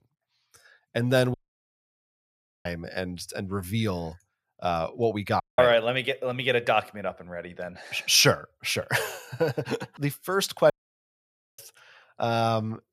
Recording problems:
audio cutting out; at 1.5 s for 1.5 s, at 5.5 s and at 11 s for 1 s

